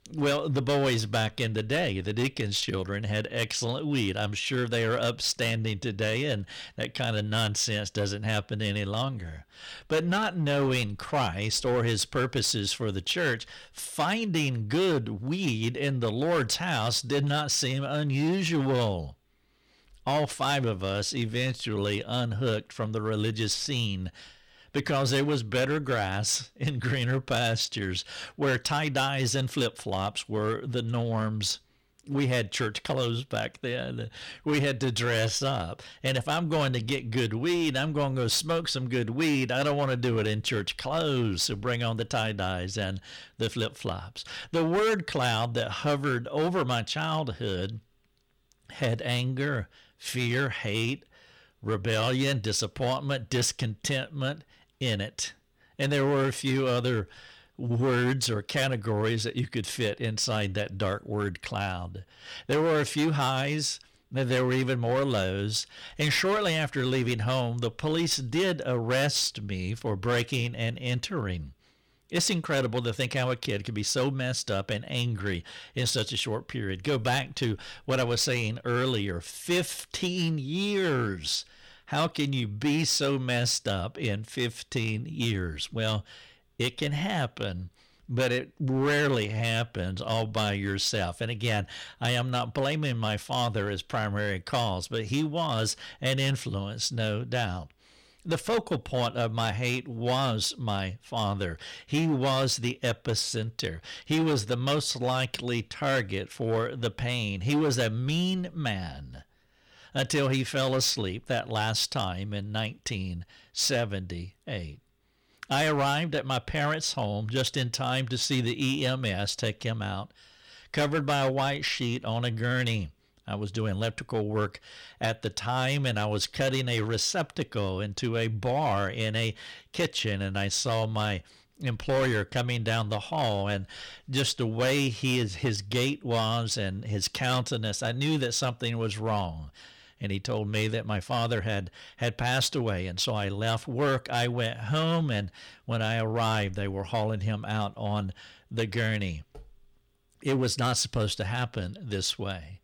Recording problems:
distortion; slight; 8% of the sound clipped

